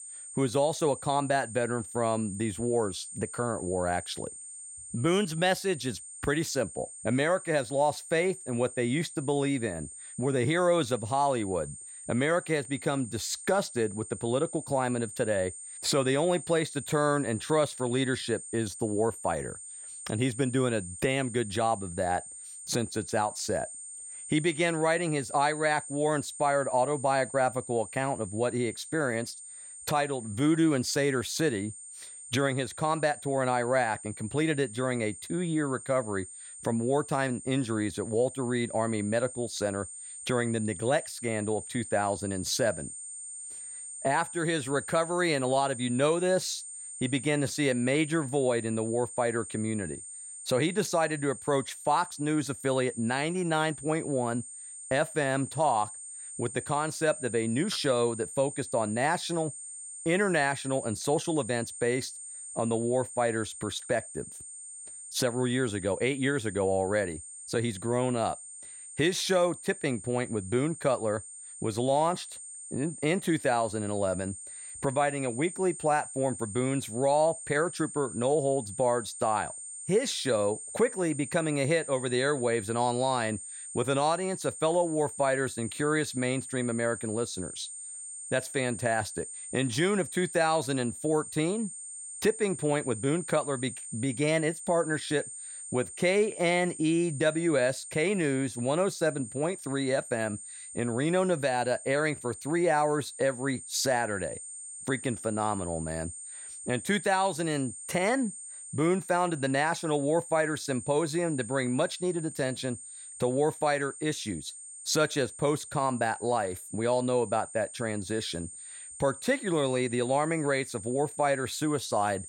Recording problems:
high-pitched whine; noticeable; throughout; 8.5 kHz, 10 dB below the speech

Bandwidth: 16.5 kHz